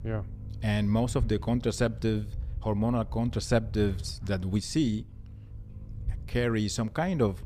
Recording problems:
low rumble; faint; throughout; 25 dB below the speech

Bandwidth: 15 kHz